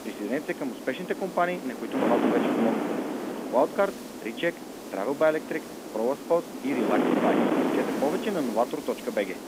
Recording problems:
phone-call audio; nothing above 3.5 kHz
muffled; very slightly; fading above 3.5 kHz
wind noise on the microphone; heavy; 3 dB below the speech
hiss; noticeable; throughout; 20 dB below the speech

